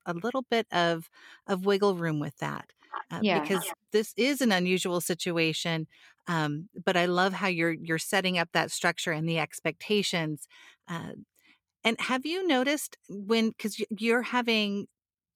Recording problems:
none

